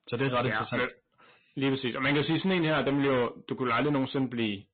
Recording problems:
distortion; heavy; 17% of the sound clipped
high frequencies cut off; severe; nothing above 4 kHz
garbled, watery; slightly

